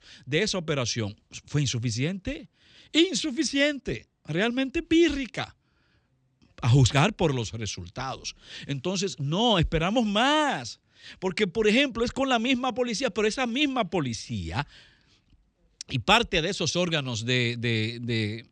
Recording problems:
none

